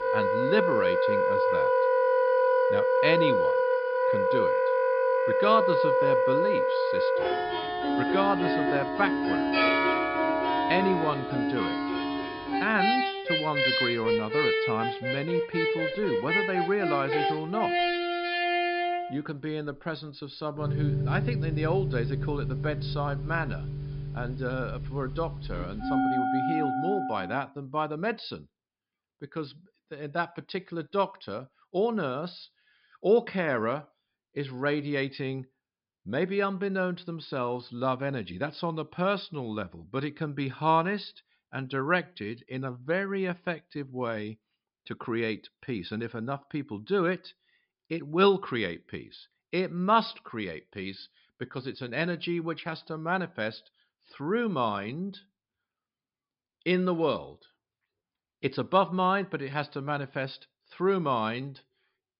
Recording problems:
high frequencies cut off; noticeable; nothing above 5.5 kHz
background music; very loud; until 27 s; 4 dB above the speech

